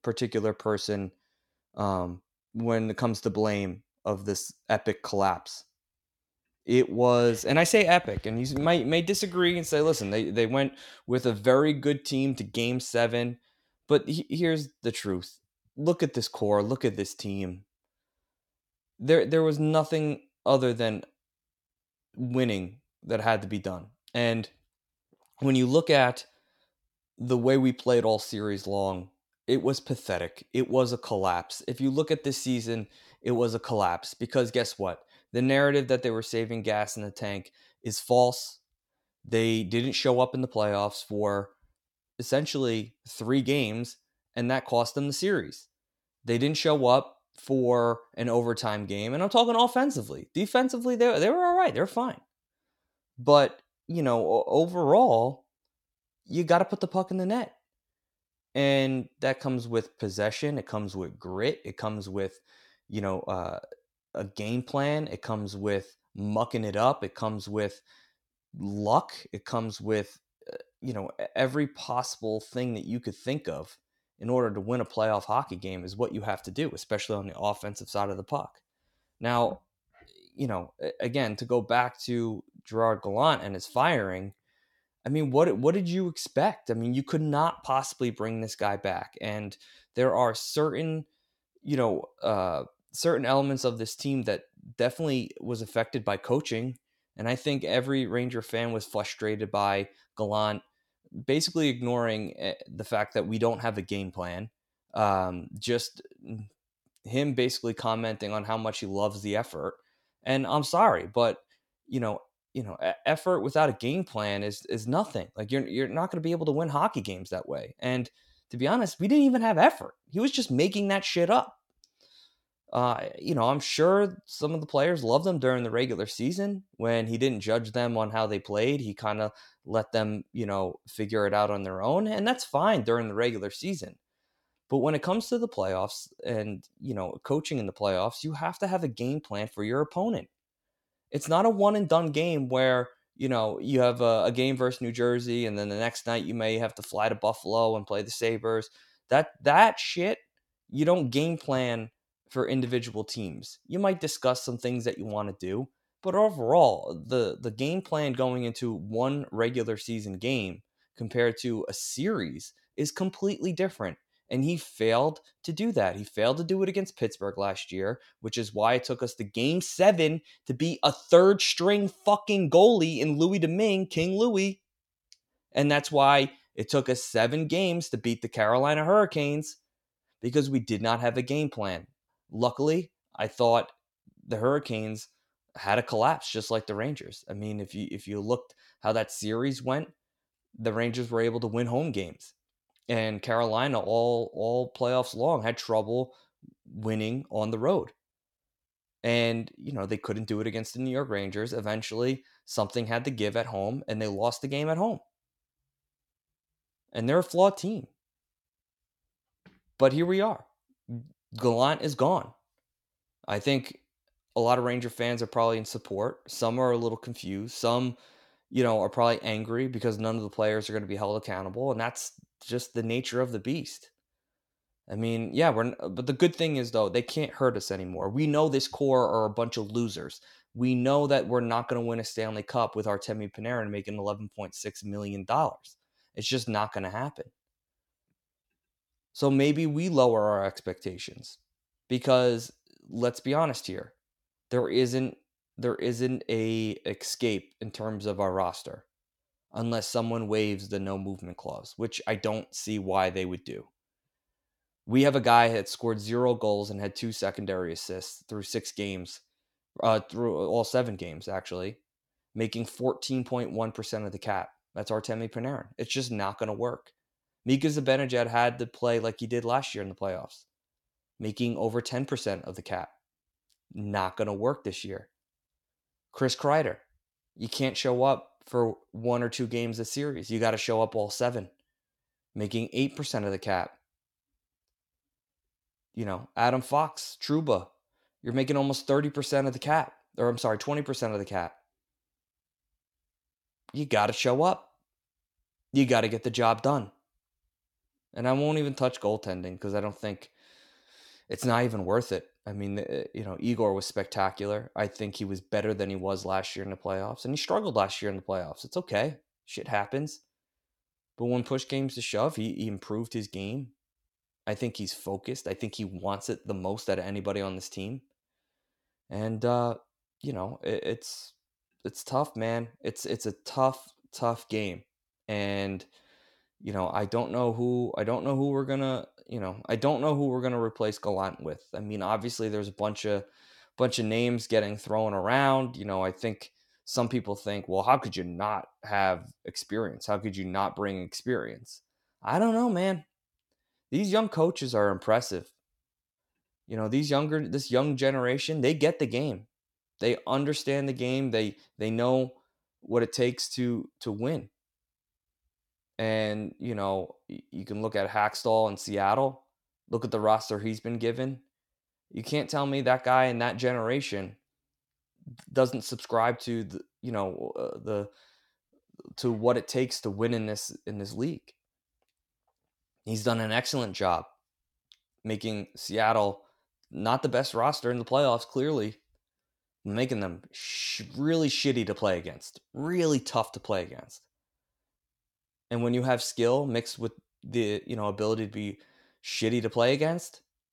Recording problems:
none

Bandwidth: 17 kHz